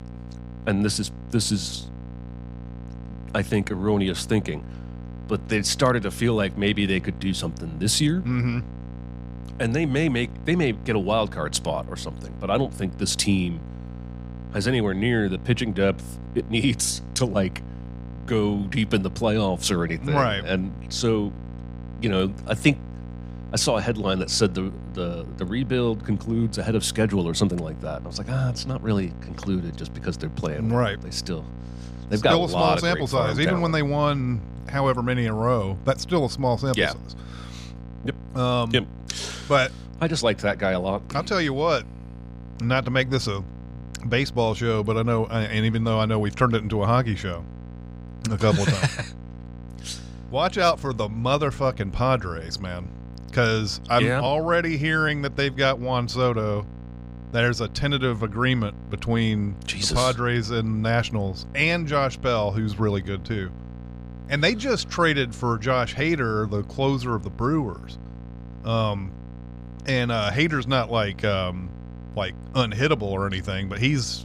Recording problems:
electrical hum; faint; throughout; 60 Hz, 20 dB below the speech

